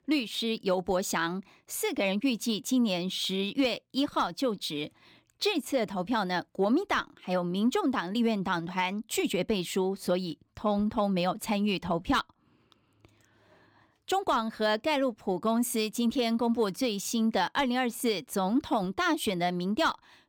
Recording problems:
none

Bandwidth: 18 kHz